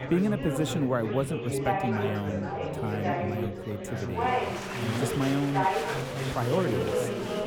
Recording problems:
chatter from many people; very loud; throughout; as loud as the speech

